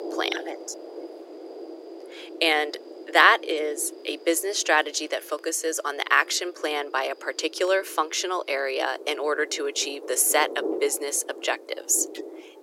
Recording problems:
thin; very; fading below 300 Hz
rain or running water; noticeable; throughout; 15 dB below the speech

